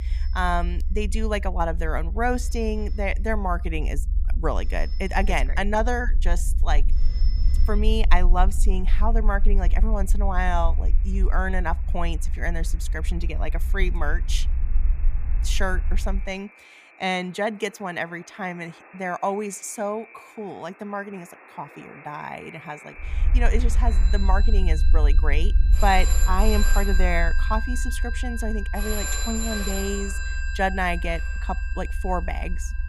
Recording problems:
alarms or sirens; loud; throughout; 7 dB below the speech
low rumble; noticeable; until 16 s and from 23 s on; 20 dB below the speech

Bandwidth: 15 kHz